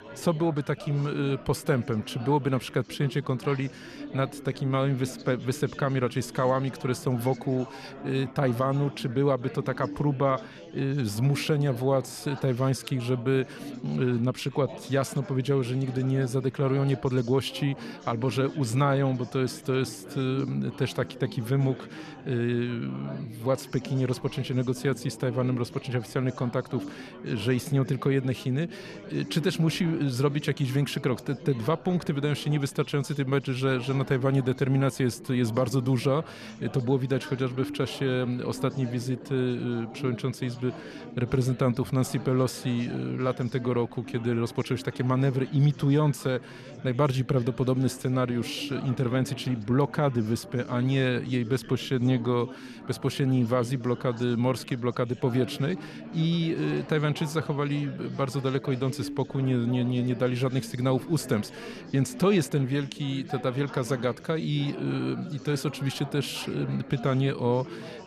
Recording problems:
chatter from many people; noticeable; throughout; 15 dB below the speech

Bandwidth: 14 kHz